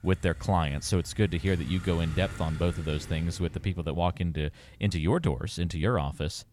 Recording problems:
traffic noise; noticeable; throughout; 15 dB below the speech

